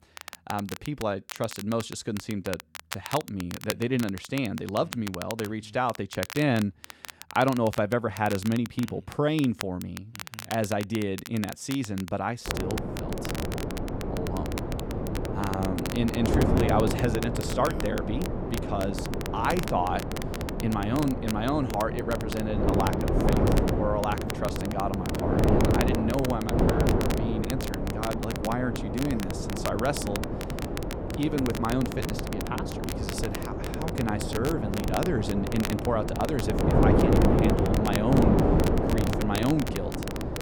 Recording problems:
wind noise on the microphone; heavy; from 12 s on; 1 dB below the speech
crackle, like an old record; noticeable; 10 dB below the speech

